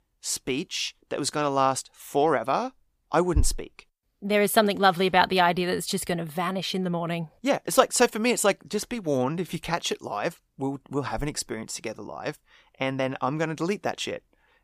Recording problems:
none

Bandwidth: 15 kHz